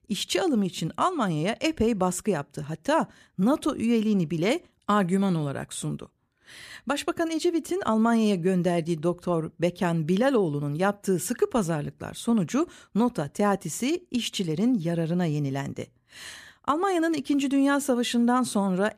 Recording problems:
none

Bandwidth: 14.5 kHz